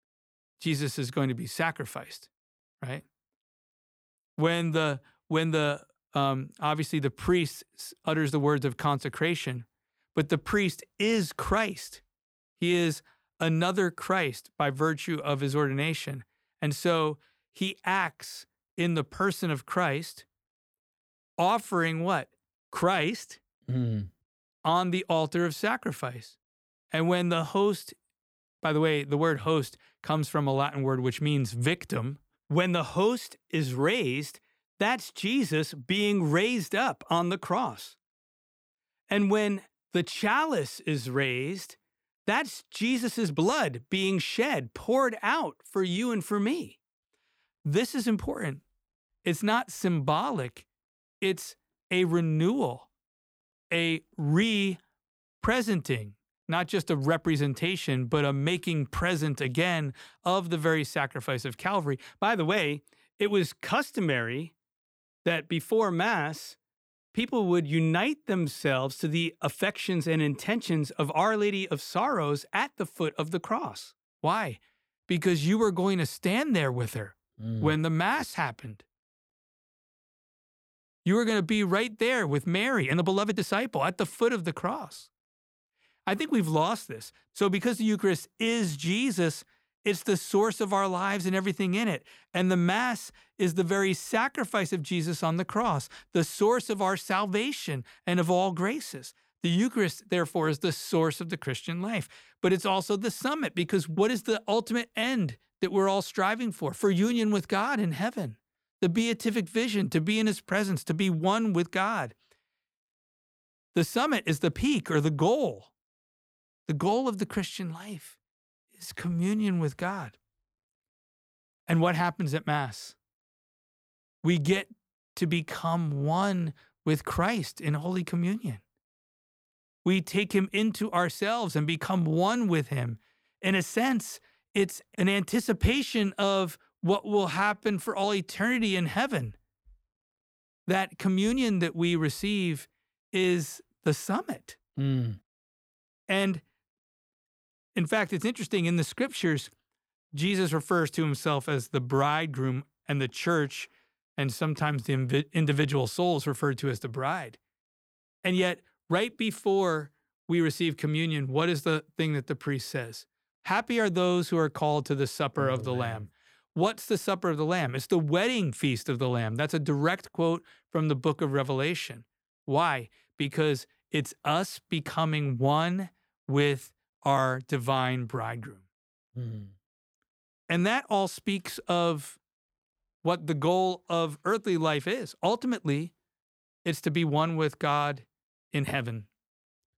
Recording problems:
uneven, jittery; strongly; from 4.5 s to 3:07

